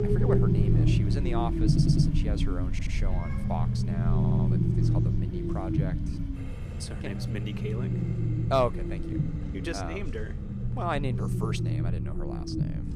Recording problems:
animal sounds; loud; throughout; 5 dB below the speech
low rumble; loud; throughout; 3 dB below the speech
household noises; noticeable; throughout; 20 dB below the speech
background chatter; faint; throughout; 3 voices, 25 dB below the speech
audio stuttering; at 1.5 s, at 2.5 s and at 4 s

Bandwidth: 14.5 kHz